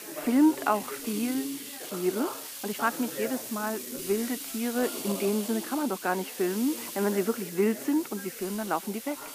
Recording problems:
muffled; slightly; fading above 2.5 kHz
thin; very slightly; fading below 300 Hz
hiss; loud; throughout; 8 dB below the speech
background chatter; noticeable; throughout; 3 voices, 15 dB below the speech
uneven, jittery; strongly; from 0.5 to 5.5 s

